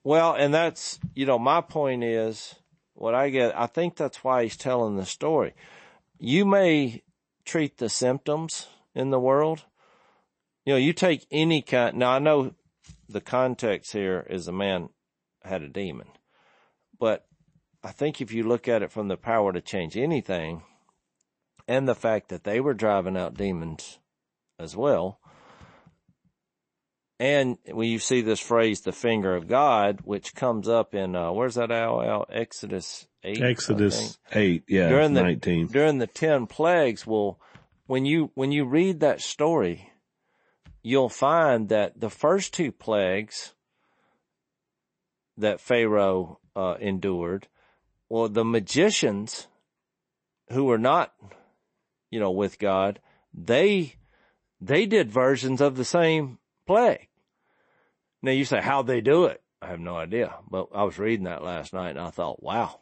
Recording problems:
garbled, watery; slightly; nothing above 8 kHz

